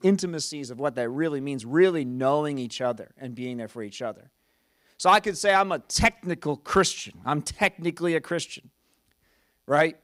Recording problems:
none

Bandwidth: 15.5 kHz